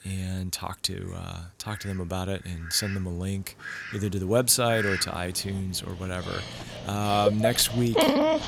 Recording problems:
animal sounds; loud; throughout; 2 dB below the speech

